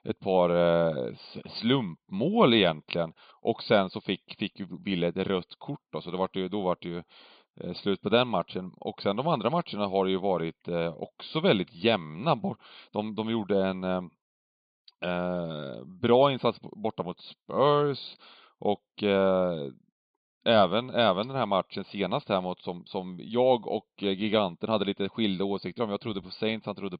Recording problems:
high frequencies cut off; severe; nothing above 5 kHz

